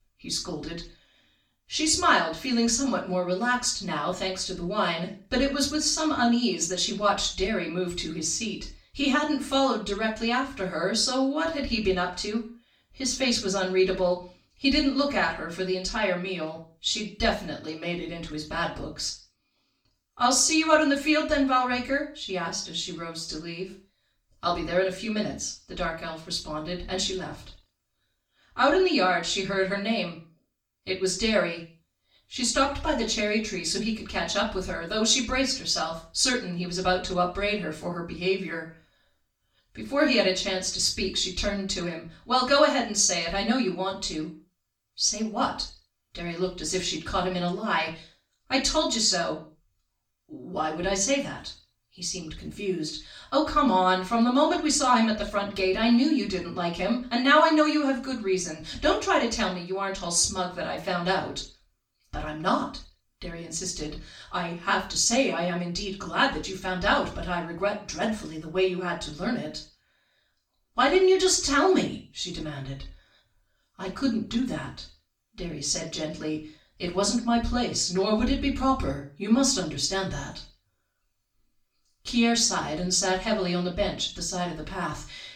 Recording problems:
off-mic speech; far
room echo; slight; dies away in 0.3 s

